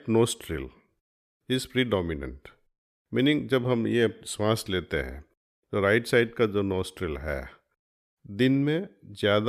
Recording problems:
abrupt cut into speech; at the end

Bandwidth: 14.5 kHz